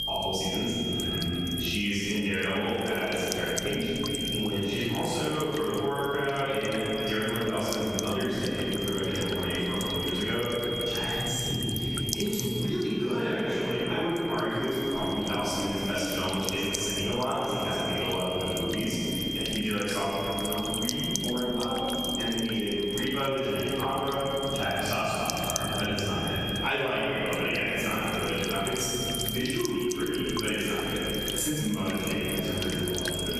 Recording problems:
room echo; strong; dies away in 3 s
off-mic speech; far
squashed, flat; somewhat
high-pitched whine; loud; throughout; 3 kHz, 5 dB below the speech
electrical hum; noticeable; throughout; 50 Hz, 10 dB below the speech

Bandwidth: 14.5 kHz